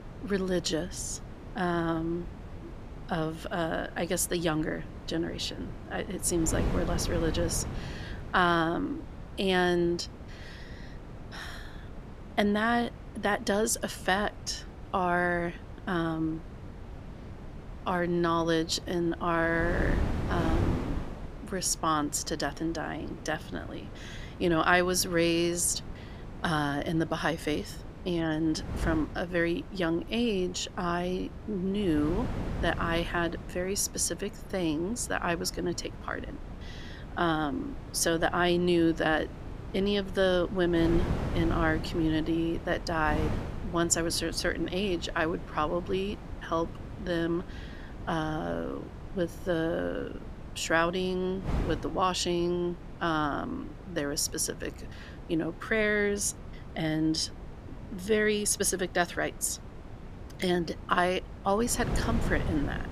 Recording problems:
wind noise on the microphone; occasional gusts; 15 dB below the speech

